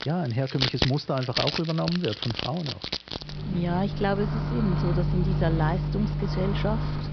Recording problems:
high frequencies cut off; noticeable; nothing above 5.5 kHz
household noises; loud; throughout; as loud as the speech
hiss; faint; throughout; 25 dB below the speech

